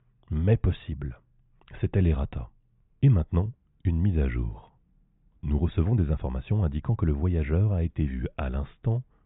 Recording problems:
high frequencies cut off; severe; nothing above 4 kHz
muffled; very slightly; fading above 2.5 kHz

